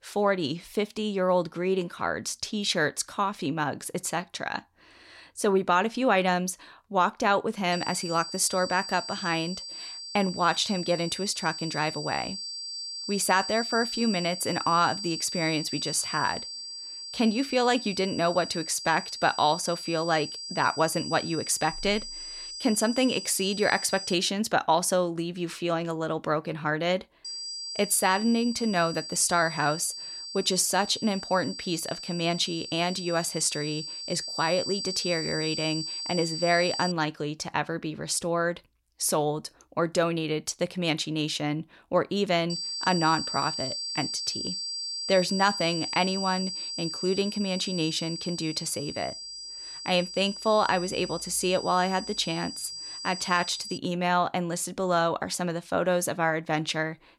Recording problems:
high-pitched whine; loud; from 7.5 to 24 s, from 27 to 37 s and from 43 to 54 s; 4.5 kHz, 7 dB below the speech

